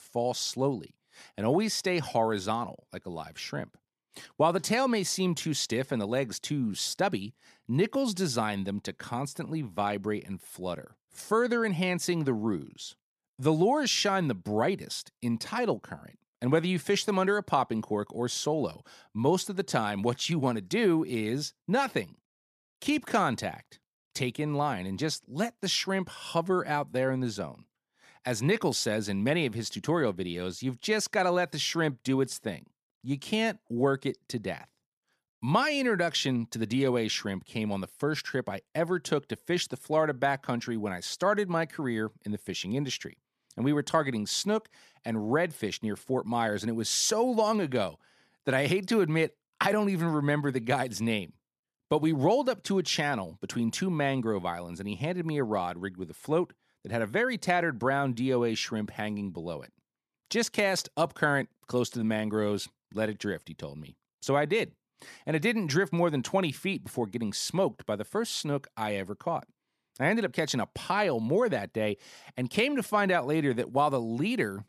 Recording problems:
none

